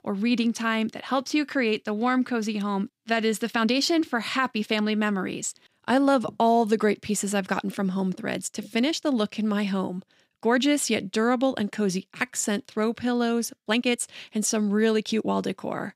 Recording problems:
uneven, jittery; strongly; from 1 to 15 s

